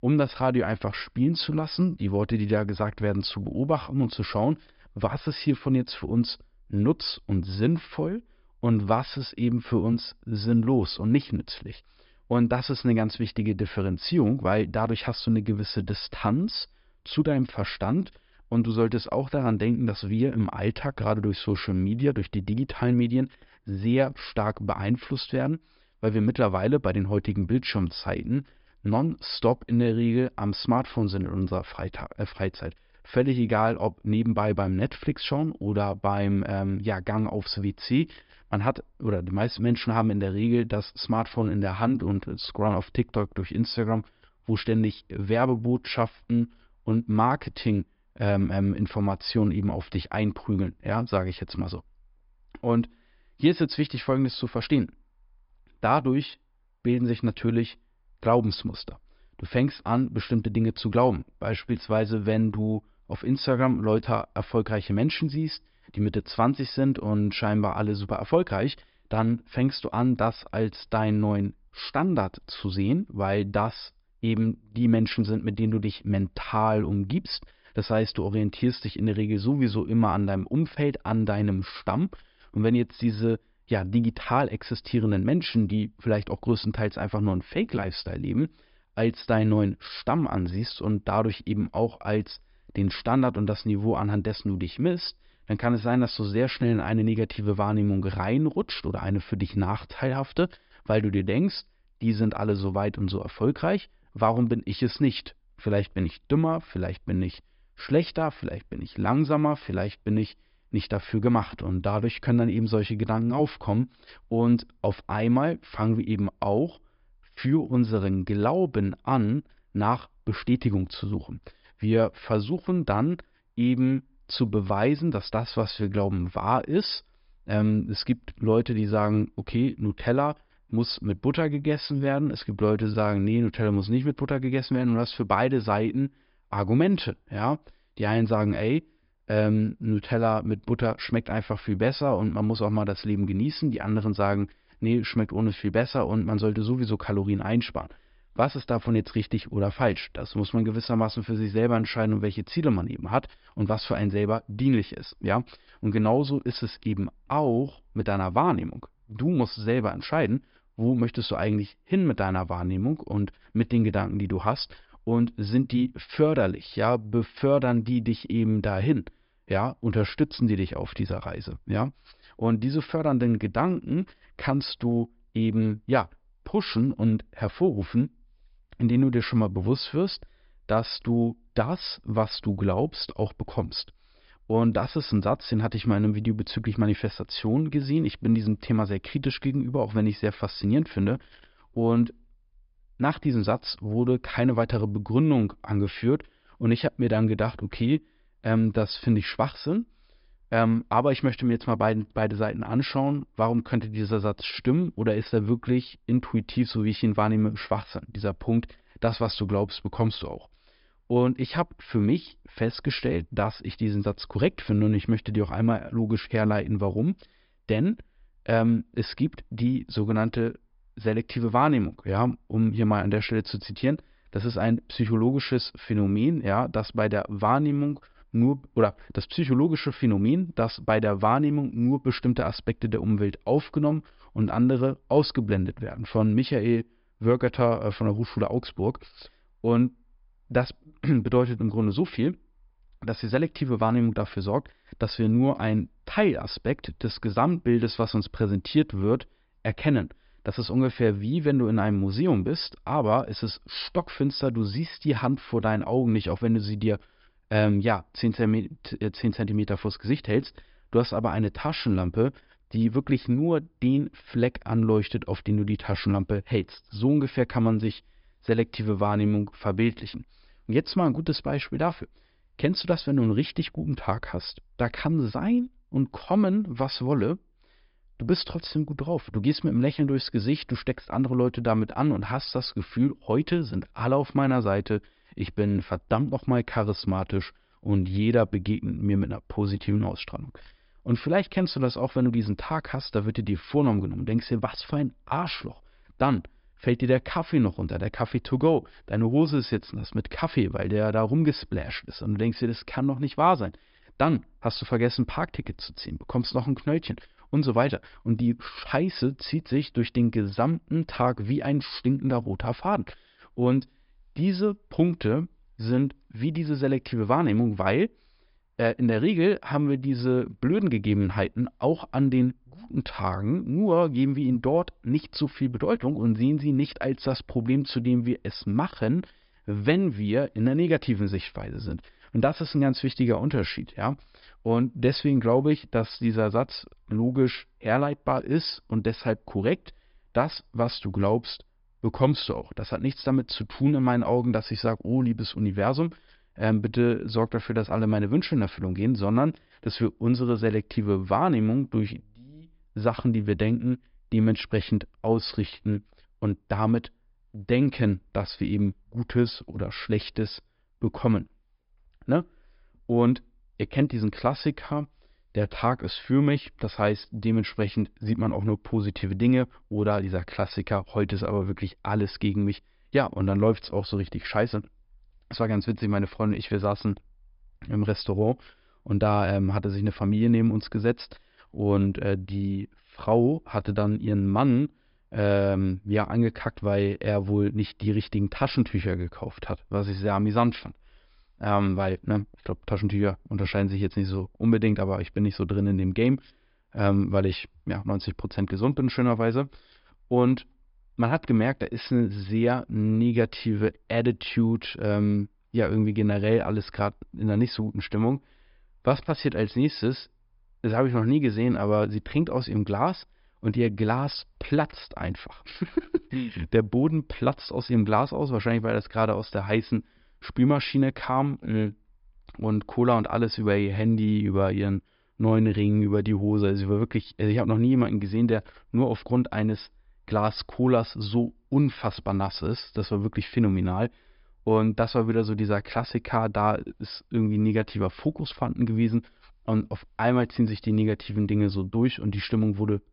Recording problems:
high frequencies cut off; noticeable; nothing above 5.5 kHz

